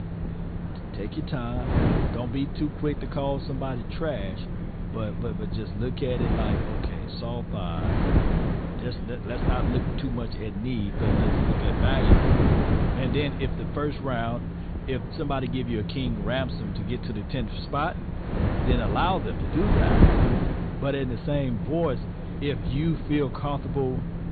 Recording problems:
high frequencies cut off; severe; nothing above 4.5 kHz
wind noise on the microphone; heavy; 2 dB below the speech
voice in the background; noticeable; throughout; 20 dB below the speech
low rumble; noticeable; throughout; 15 dB below the speech

